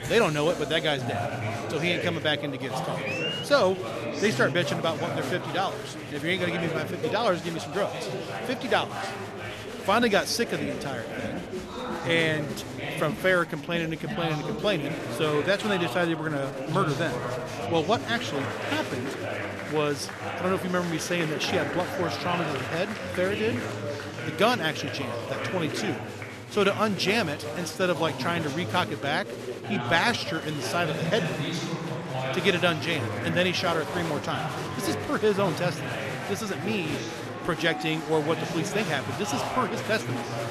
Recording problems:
chatter from many people; loud; throughout; 5 dB below the speech

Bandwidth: 13.5 kHz